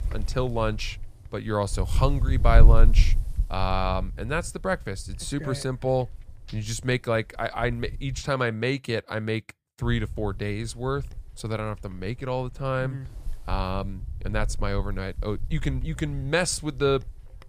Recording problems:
wind noise on the microphone; occasional gusts; until 8 s and from 10 s on; 20 dB below the speech

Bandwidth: 14.5 kHz